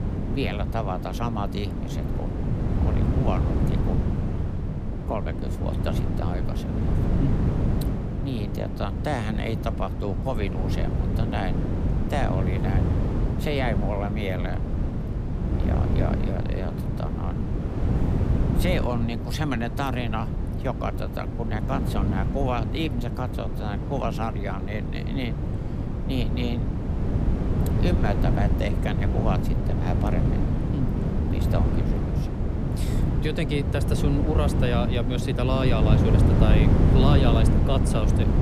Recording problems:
wind noise on the microphone; heavy; 3 dB below the speech

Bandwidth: 14.5 kHz